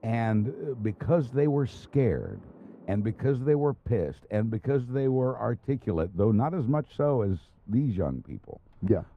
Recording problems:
muffled; very; fading above 2 kHz
rain or running water; faint; throughout; 30 dB below the speech

